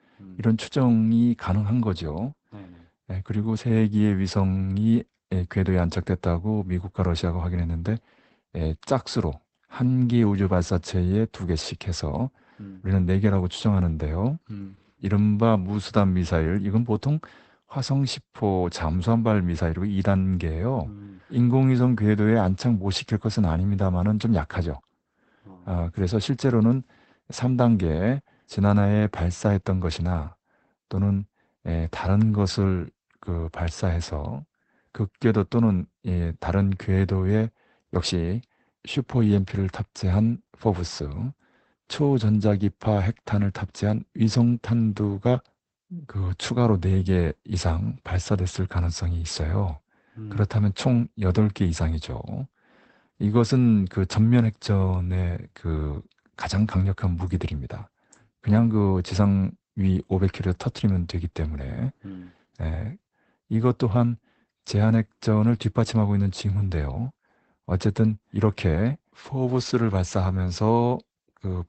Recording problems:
garbled, watery; badly; nothing above 8 kHz

